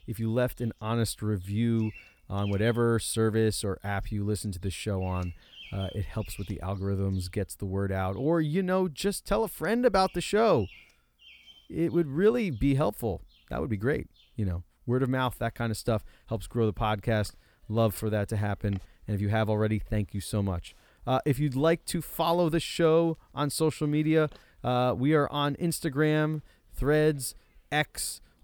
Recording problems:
animal sounds; faint; throughout; 25 dB below the speech

